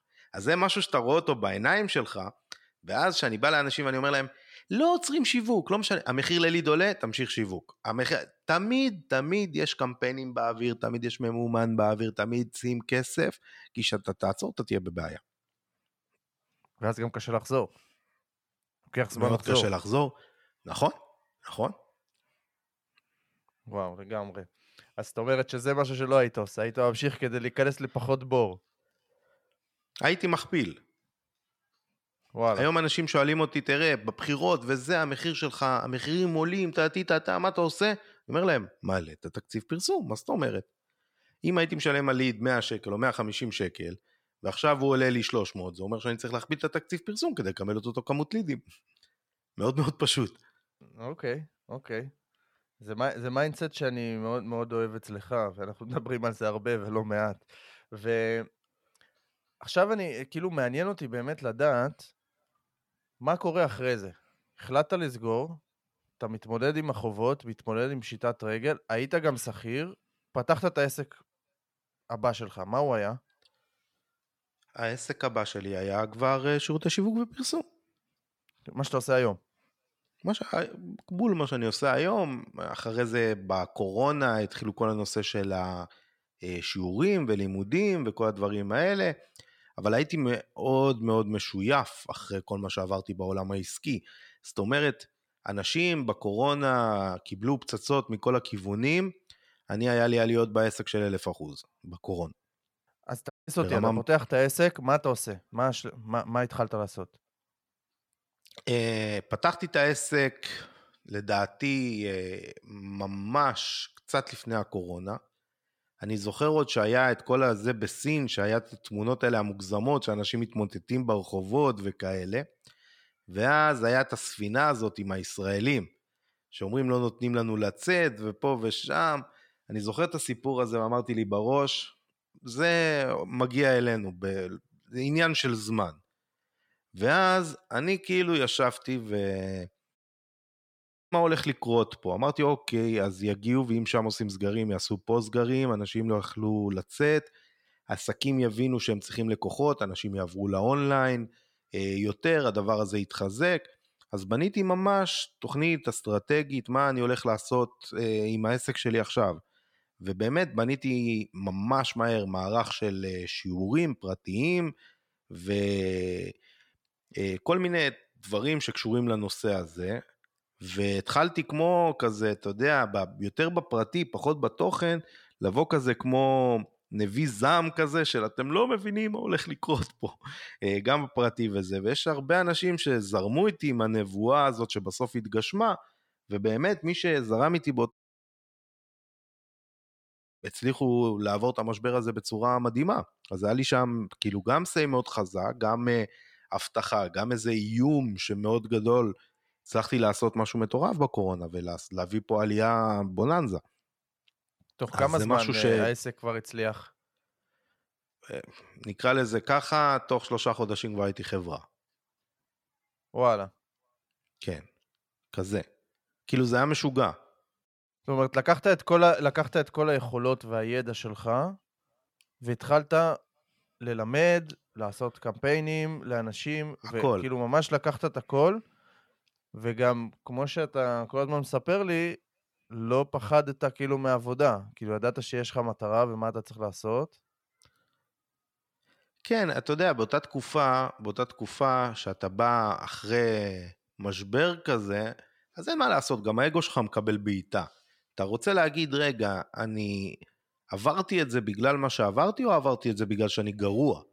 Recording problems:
audio cutting out; at 1:43, at 2:20 for 1 s and at 3:08 for 2.5 s

